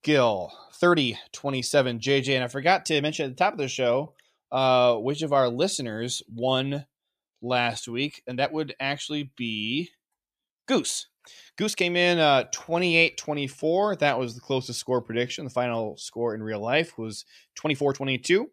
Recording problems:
uneven, jittery; strongly; from 0.5 to 18 s

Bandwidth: 14.5 kHz